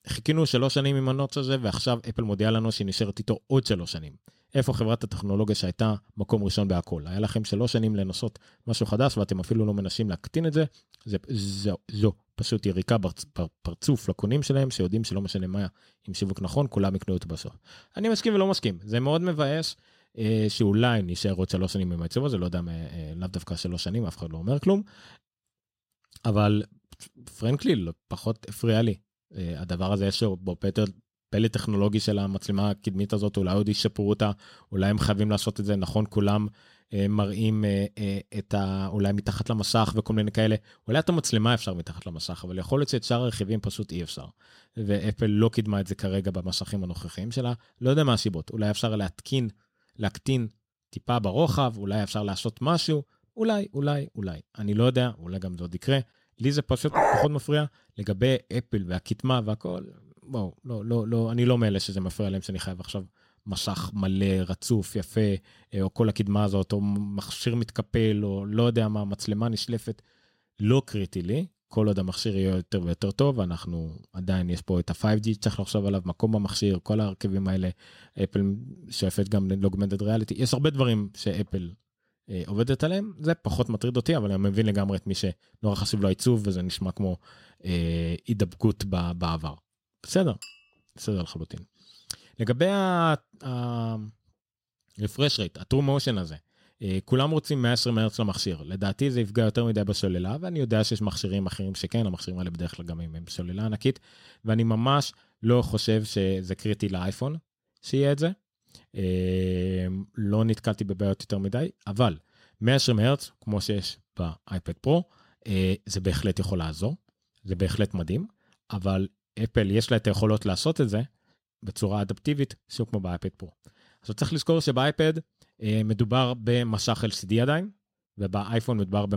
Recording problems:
dog barking; loud; at 57 s; peak 5 dB above the speech
clattering dishes; faint; at 1:30; peak 20 dB below the speech
abrupt cut into speech; at the end

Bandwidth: 16 kHz